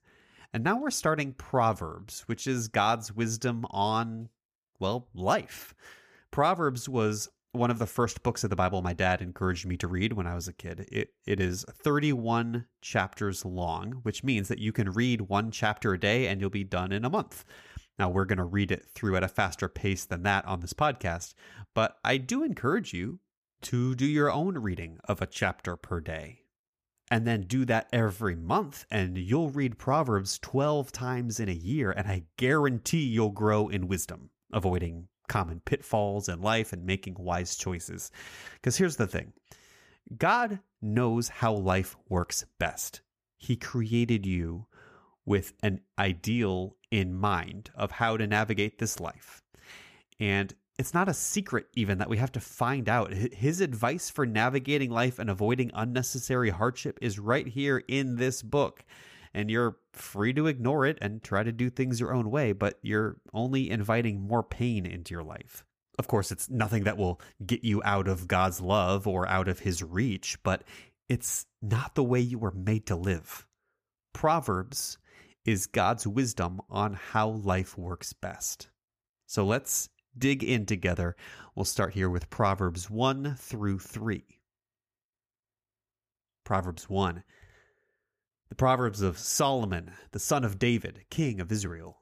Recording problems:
none

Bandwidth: 15 kHz